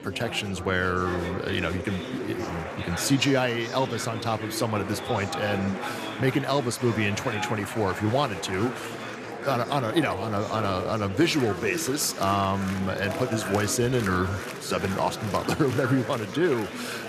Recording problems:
murmuring crowd; loud; throughout; 7 dB below the speech

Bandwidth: 14 kHz